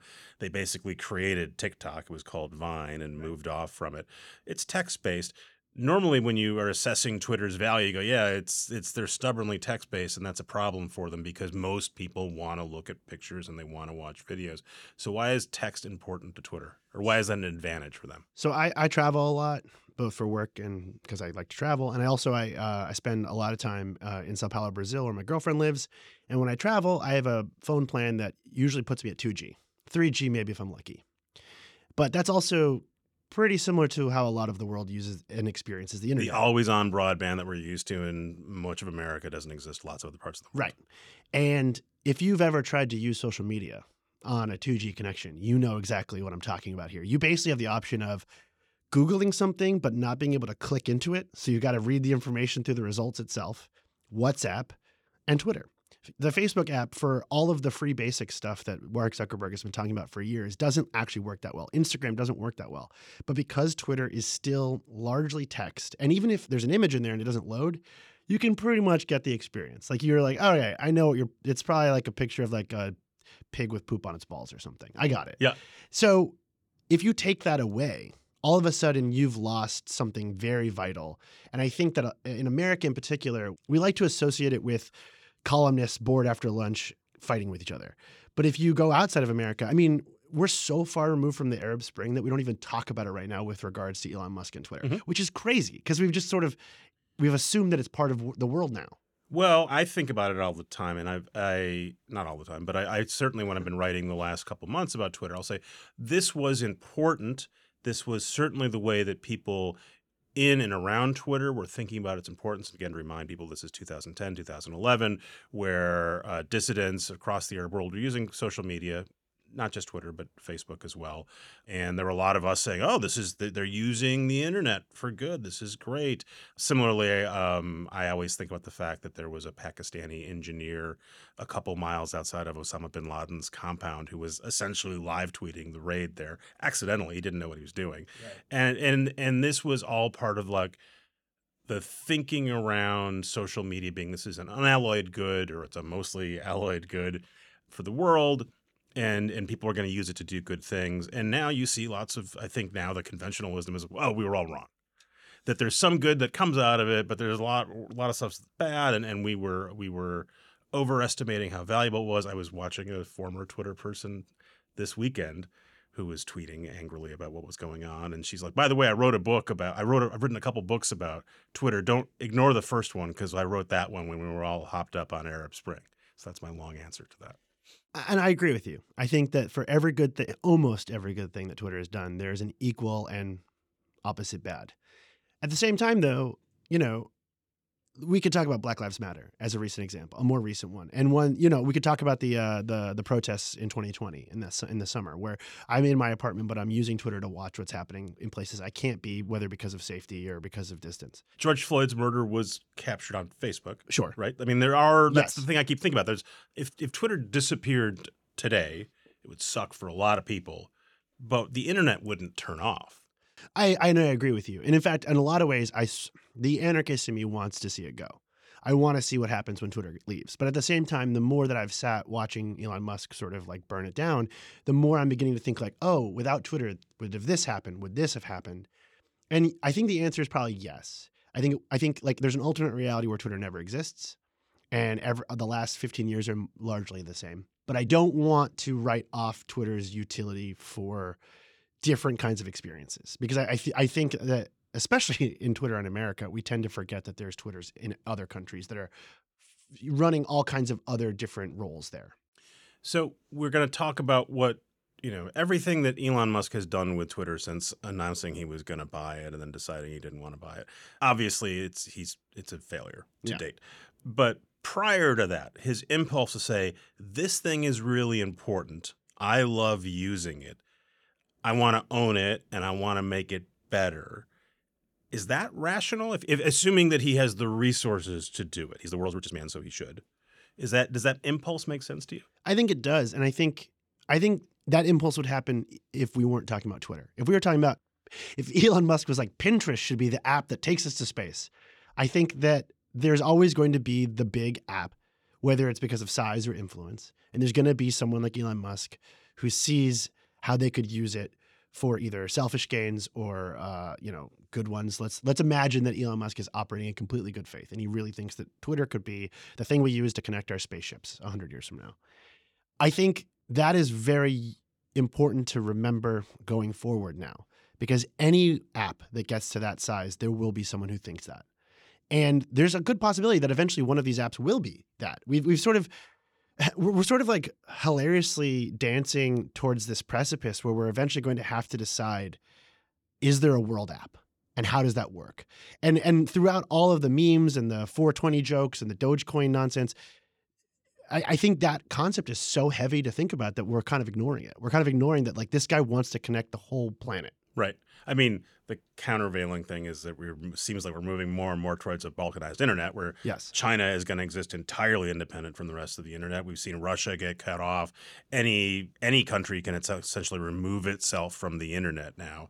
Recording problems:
uneven, jittery; strongly; from 44 s to 6:01

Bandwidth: 18.5 kHz